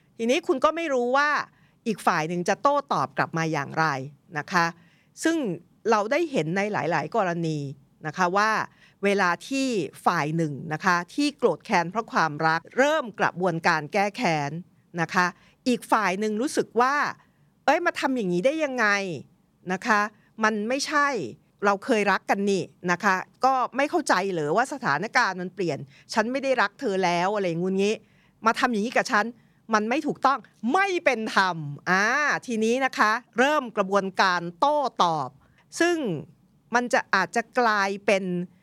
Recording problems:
none

